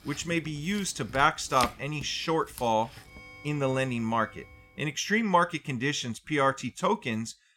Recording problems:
household noises; noticeable; until 4.5 s; 15 dB below the speech

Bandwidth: 16.5 kHz